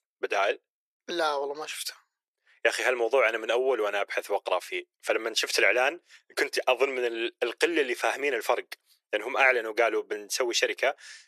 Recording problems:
thin; very; fading below 350 Hz

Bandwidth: 13.5 kHz